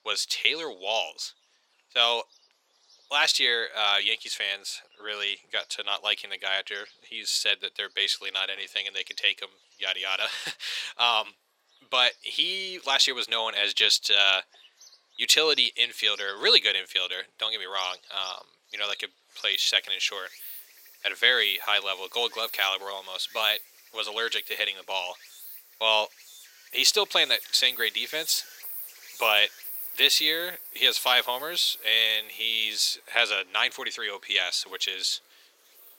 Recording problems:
thin; very; fading below 450 Hz
animal sounds; noticeable; throughout; 15 dB below the speech

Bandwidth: 16.5 kHz